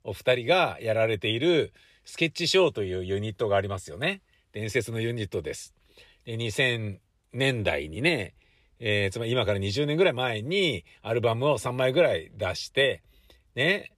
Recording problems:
none

